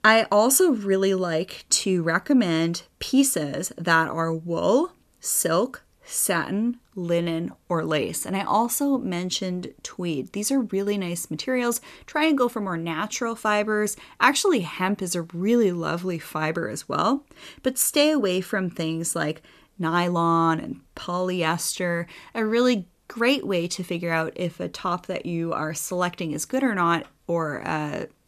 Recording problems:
none

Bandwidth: 14 kHz